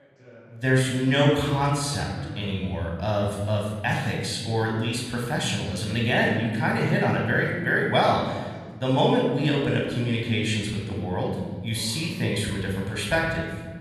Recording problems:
room echo; noticeable; dies away in 1.4 s
off-mic speech; somewhat distant
voice in the background; faint; throughout; 25 dB below the speech

